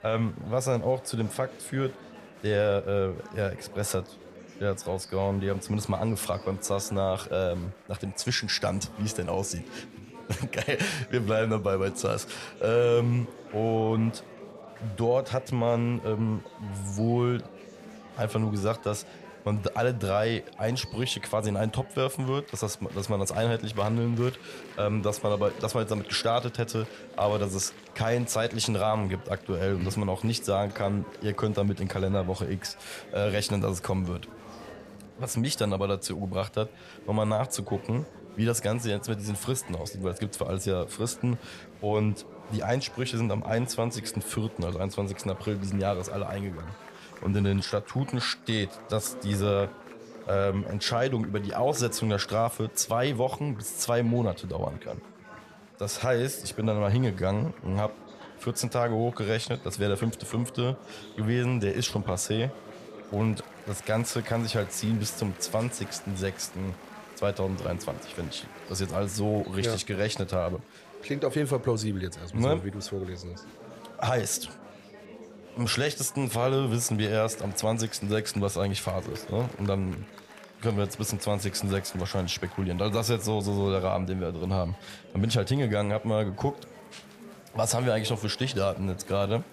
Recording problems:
chatter from many people; noticeable; throughout; 15 dB below the speech

